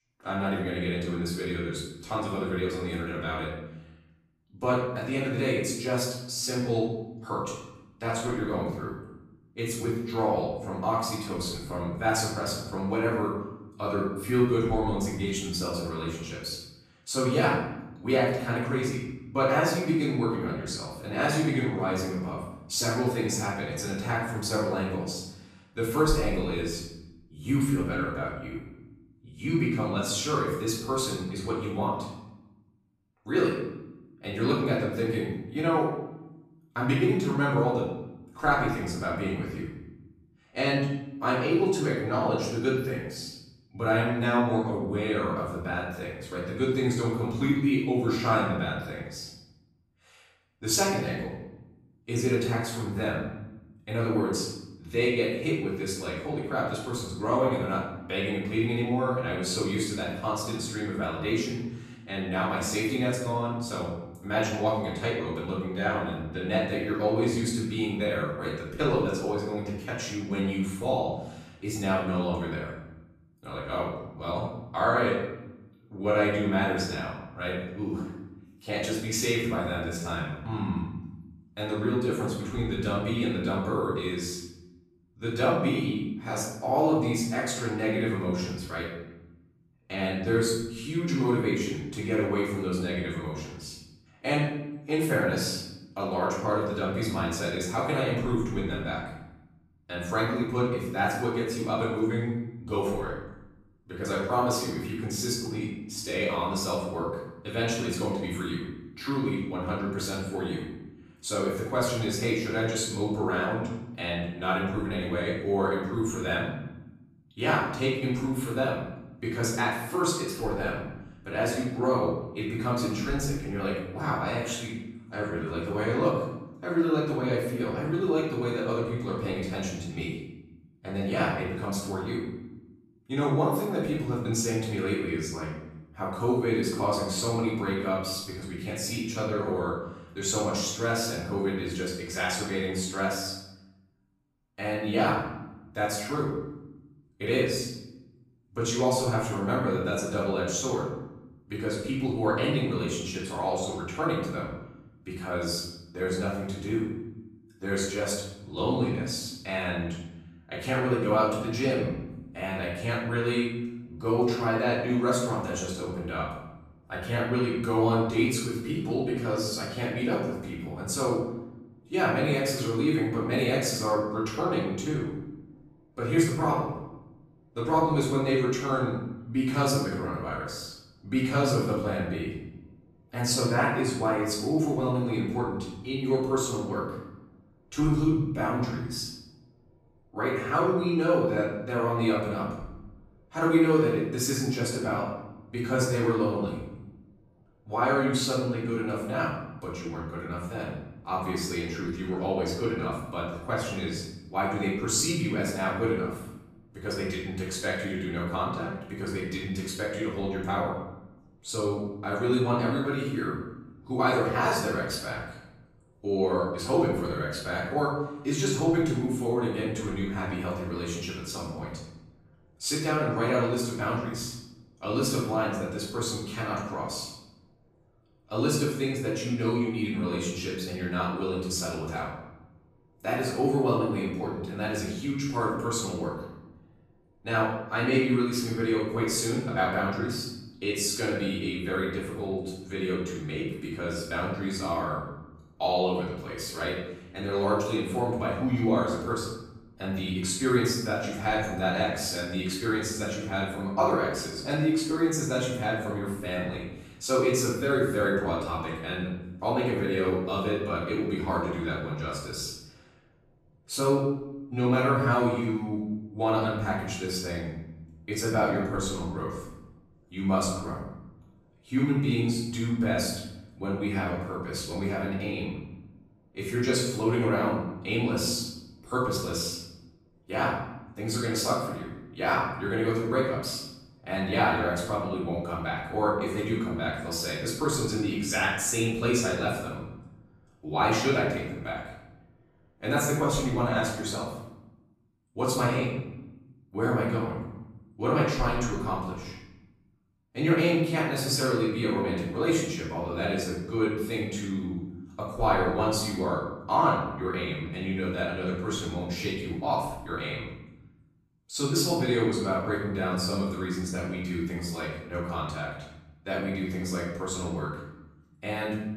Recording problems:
off-mic speech; far
room echo; noticeable; dies away in 0.9 s

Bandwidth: 14.5 kHz